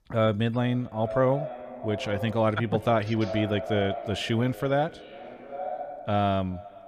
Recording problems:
echo of what is said; strong; throughout; 390 ms later, 10 dB below the speech

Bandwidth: 14.5 kHz